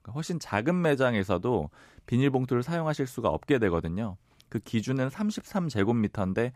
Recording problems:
none

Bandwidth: 14.5 kHz